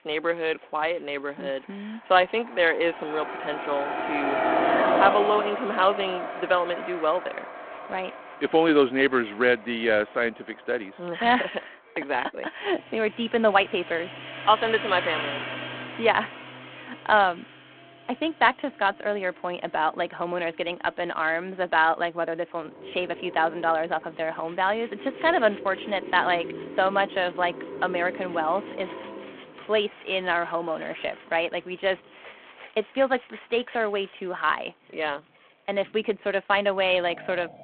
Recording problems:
phone-call audio
traffic noise; loud; throughout; 6 dB below the speech
background music; faint; throughout; 25 dB below the speech

